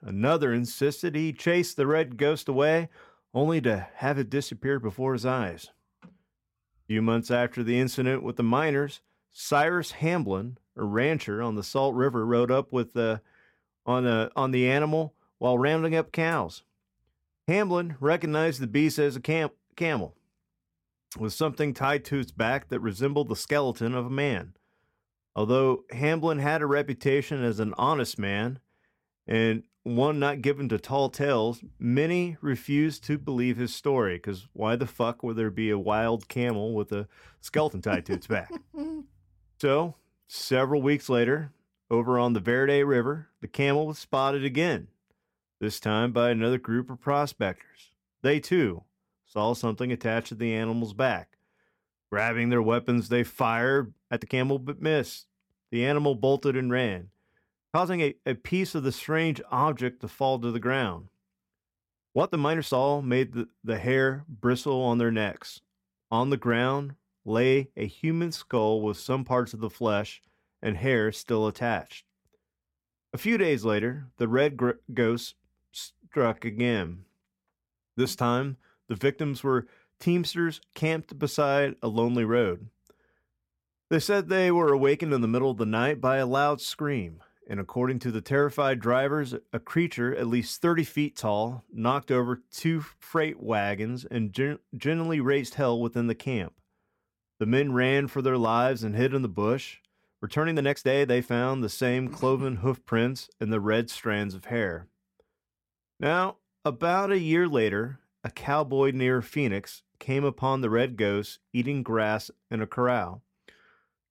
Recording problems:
uneven, jittery; strongly; from 2 s to 1:49

